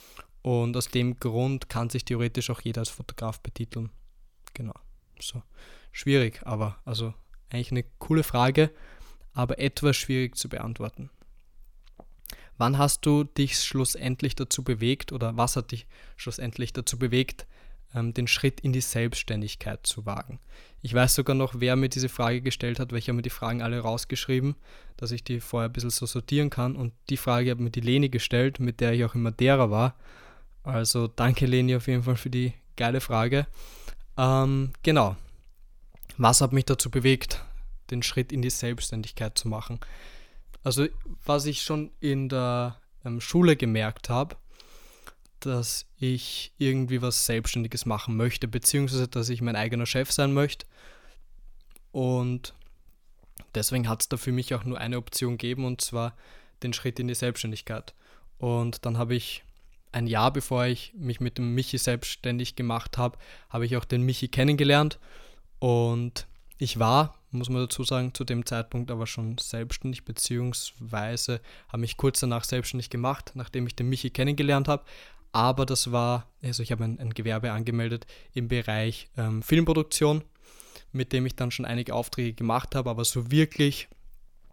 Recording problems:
none

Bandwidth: 18.5 kHz